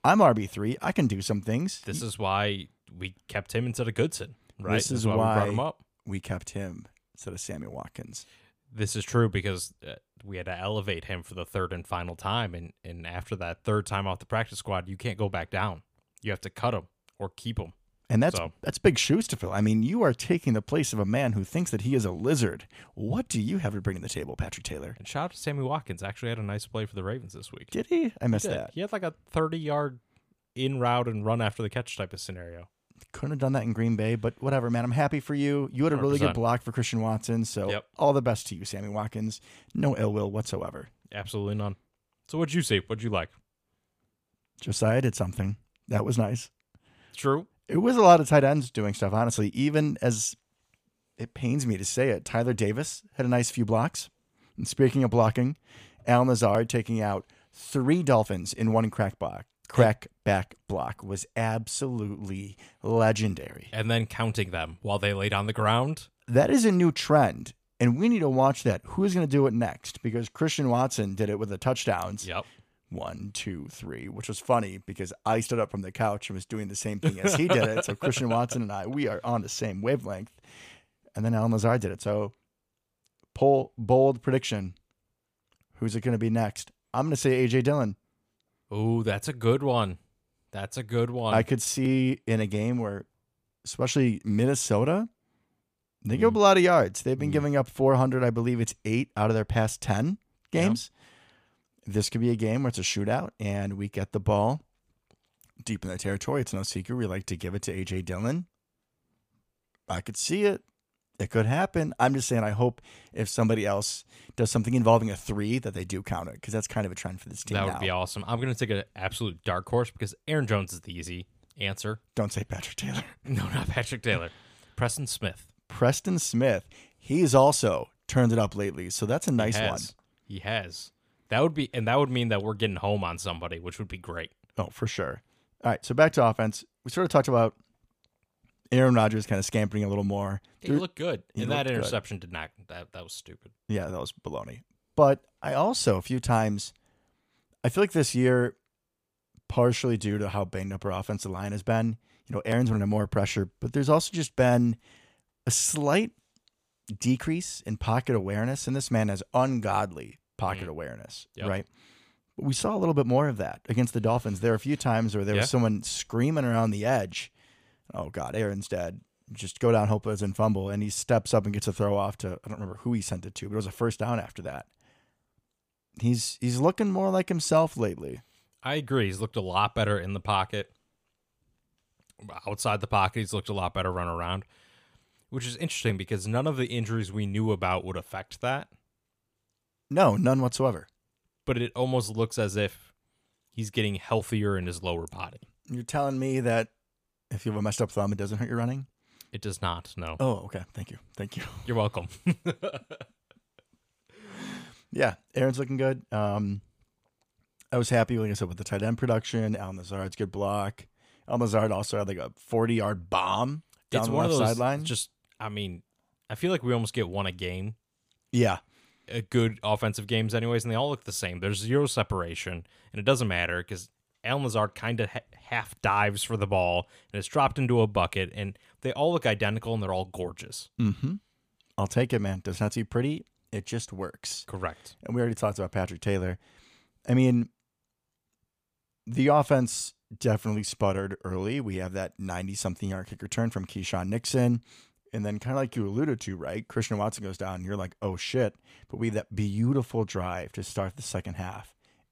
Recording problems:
none

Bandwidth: 15 kHz